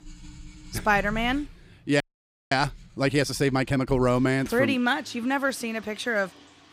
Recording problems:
household noises; faint; throughout; 20 dB below the speech
audio freezing; at 2 s for 0.5 s

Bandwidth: 15.5 kHz